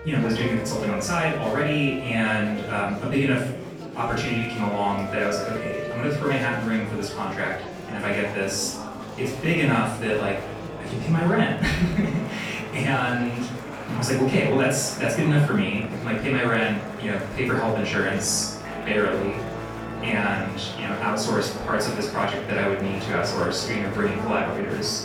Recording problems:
off-mic speech; far
room echo; noticeable; dies away in 0.5 s
background music; noticeable; throughout; 10 dB below the speech
murmuring crowd; noticeable; throughout; 10 dB below the speech

